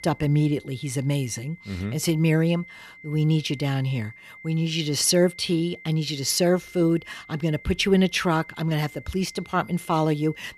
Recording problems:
high-pitched whine; faint; throughout; 2 kHz, 20 dB below the speech

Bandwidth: 15 kHz